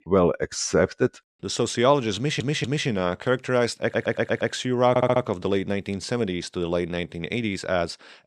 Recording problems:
audio stuttering; at 2 s, at 4 s and at 5 s

